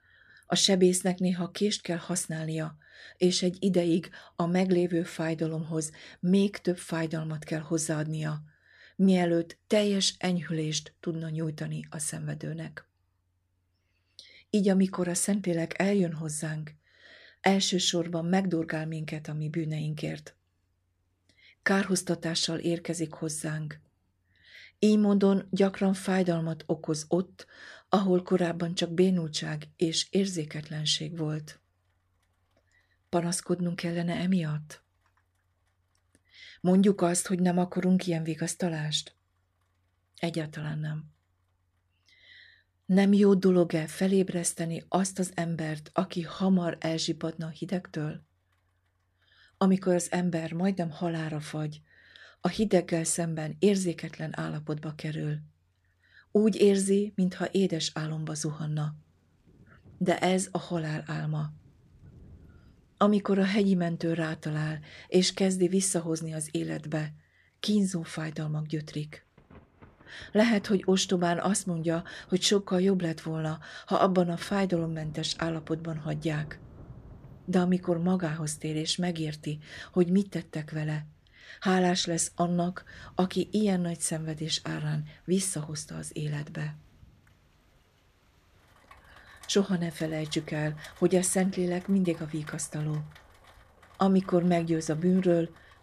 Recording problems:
rain or running water; faint; throughout; 30 dB below the speech

